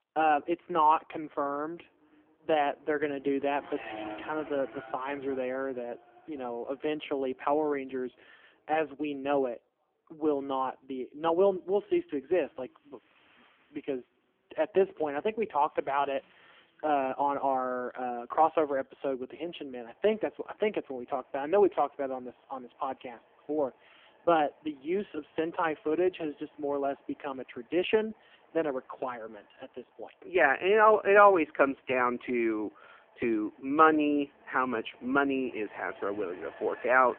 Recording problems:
phone-call audio; poor line
traffic noise; faint; throughout; 25 dB below the speech

